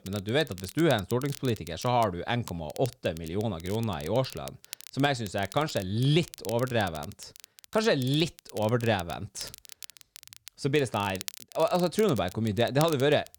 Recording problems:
crackle, like an old record; noticeable; 15 dB below the speech

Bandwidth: 18.5 kHz